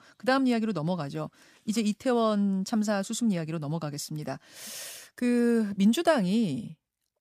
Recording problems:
none

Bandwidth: 15 kHz